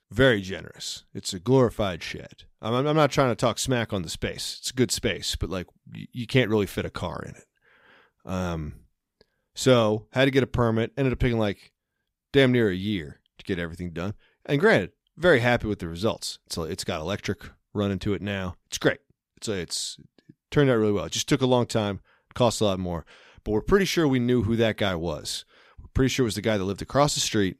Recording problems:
none

